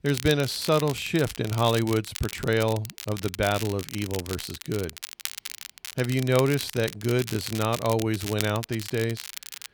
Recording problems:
crackle, like an old record; noticeable; 10 dB below the speech

